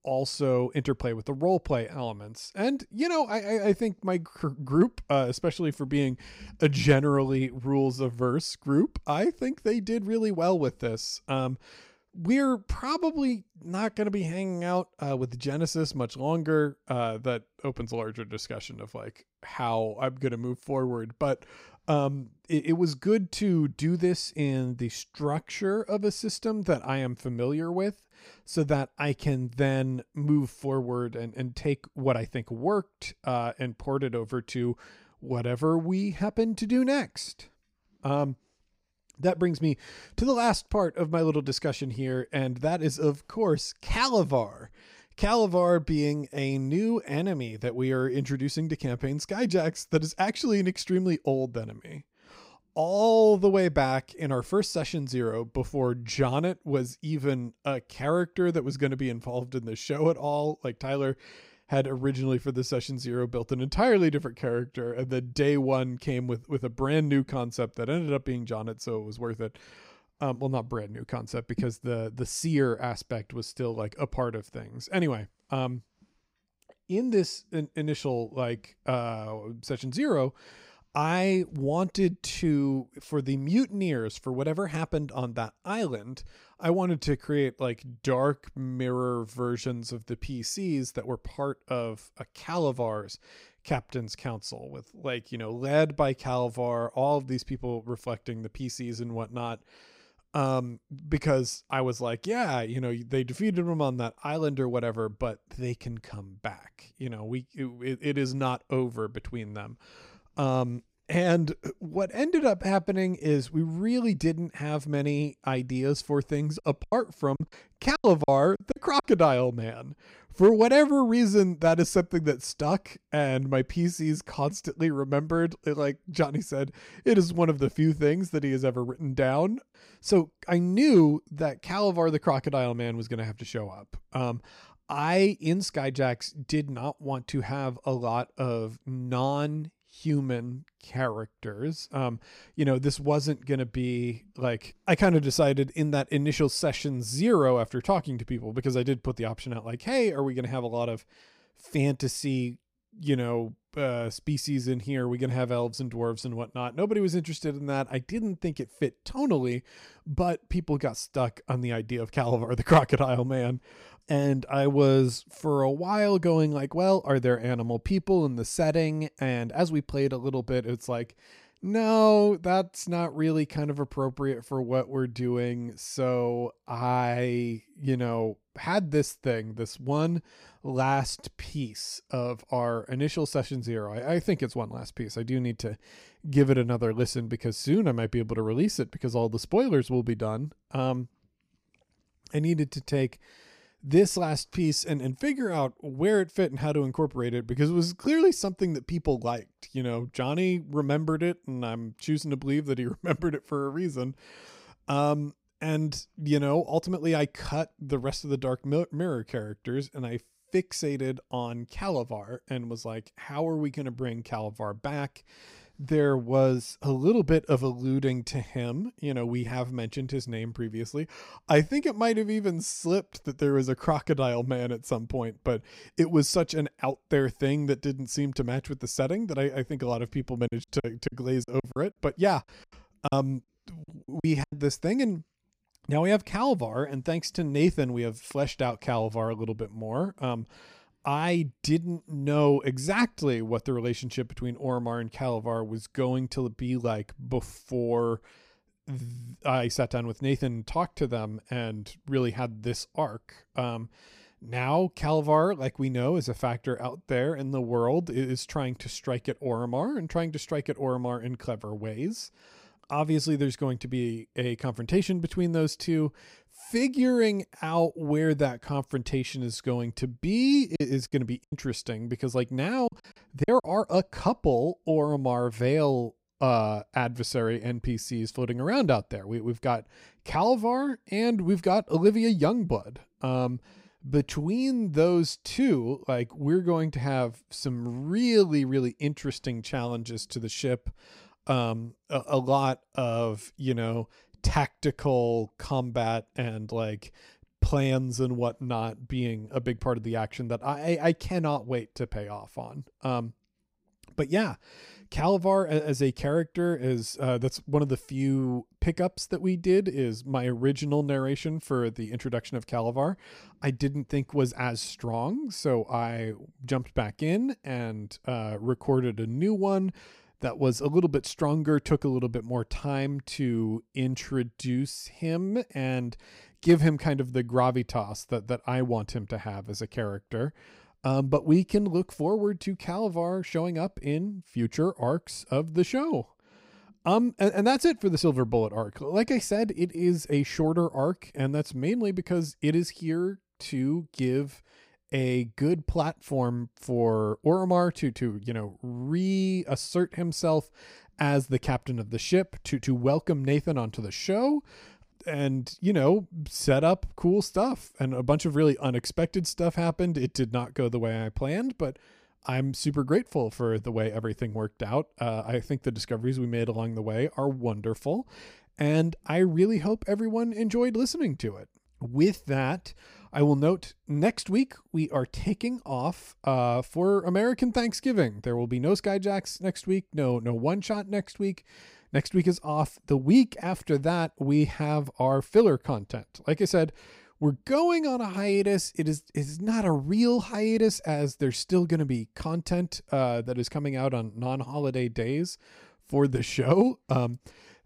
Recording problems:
choppy; very; from 1:57 to 1:59, from 3:50 to 3:55 and from 4:31 to 4:34; 11% of the speech affected

